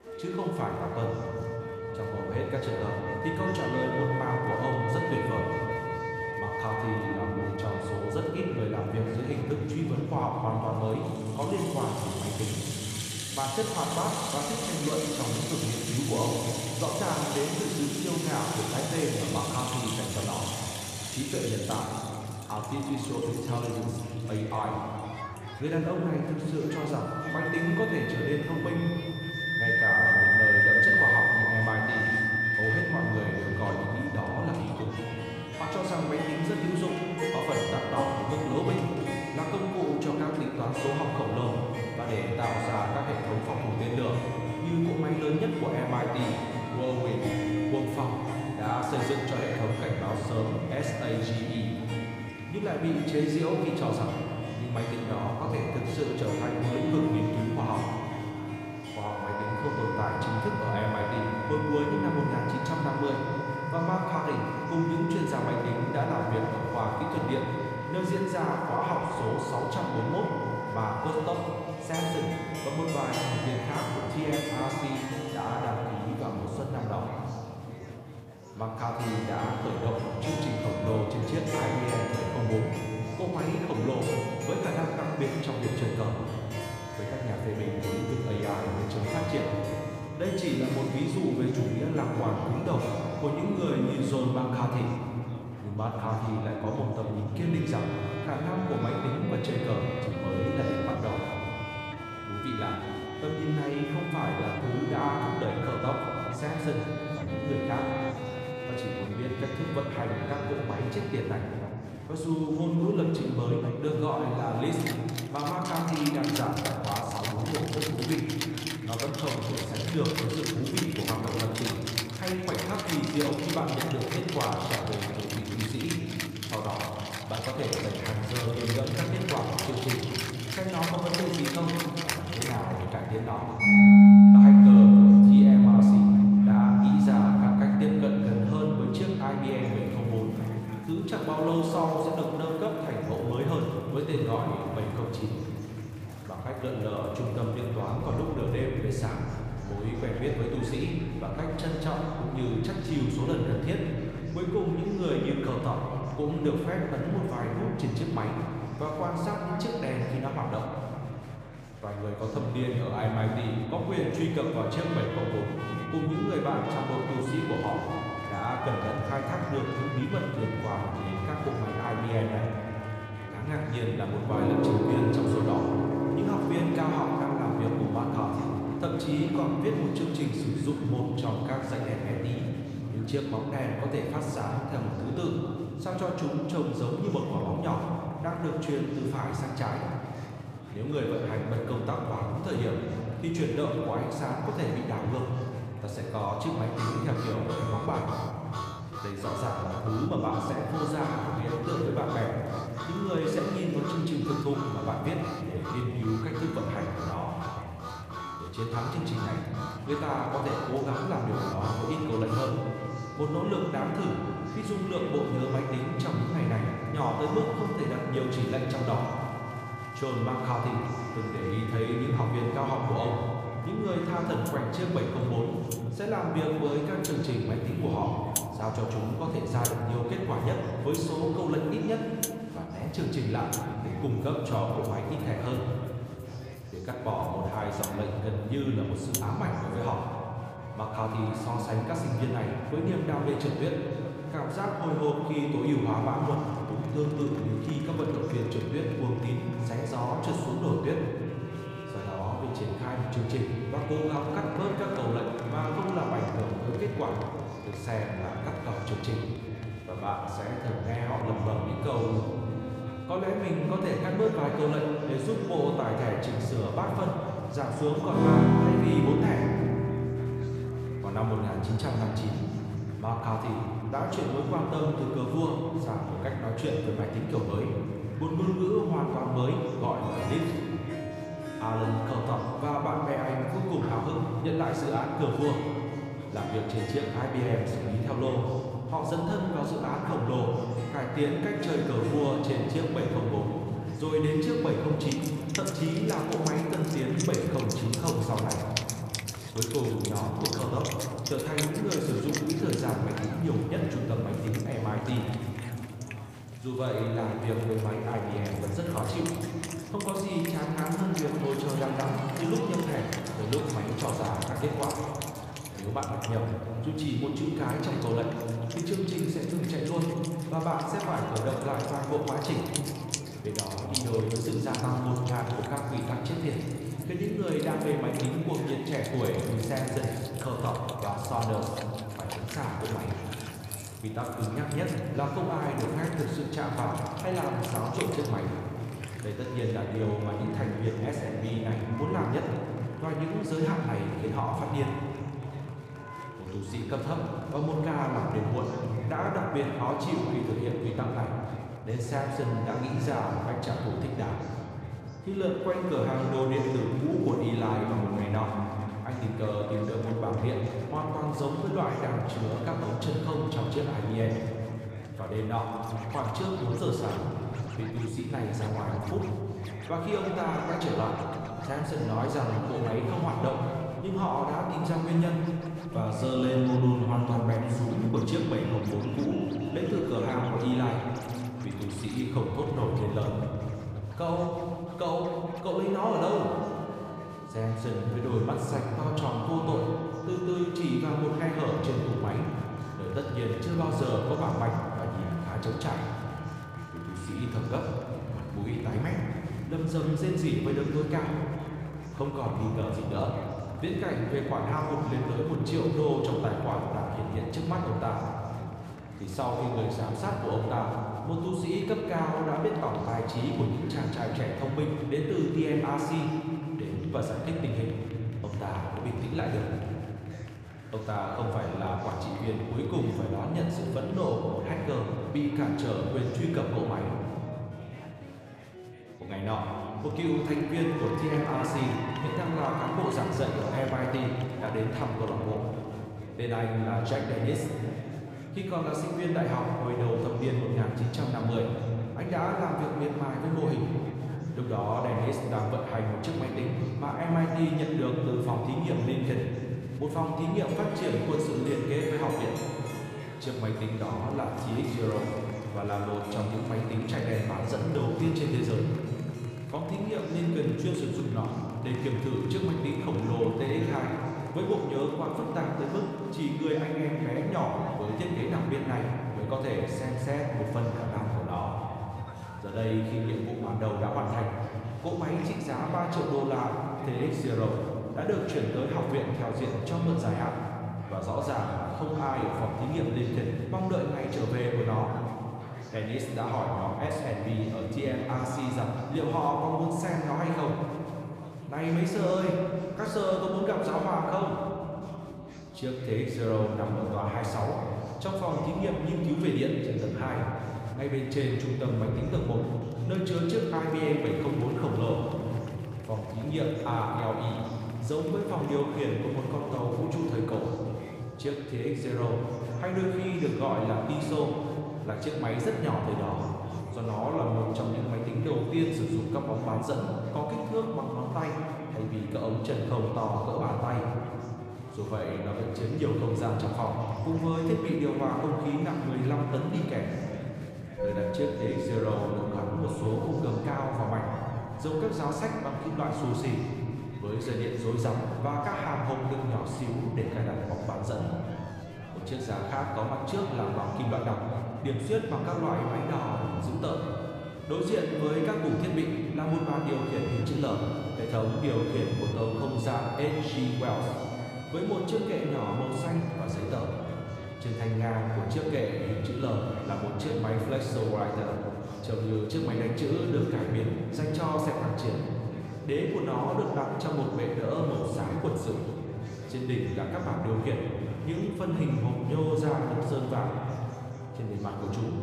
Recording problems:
room echo; noticeable; dies away in 2.9 s
off-mic speech; somewhat distant
background music; very loud; throughout; as loud as the speech
chatter from many people; noticeable; throughout; 20 dB below the speech

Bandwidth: 15 kHz